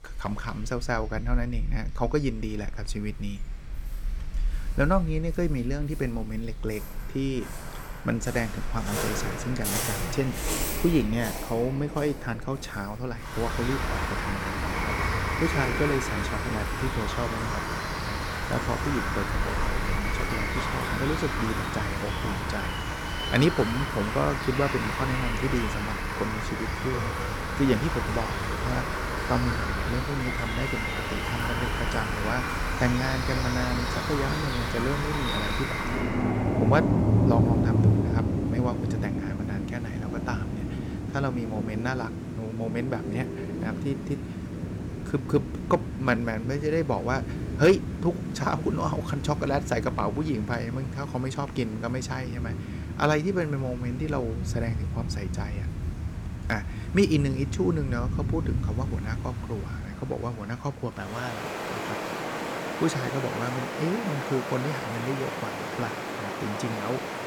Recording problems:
rain or running water; loud; throughout; 1 dB below the speech

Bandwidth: 17.5 kHz